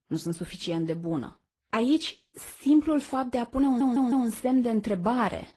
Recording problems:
garbled, watery; slightly; nothing above 12 kHz
audio stuttering; at 3.5 s

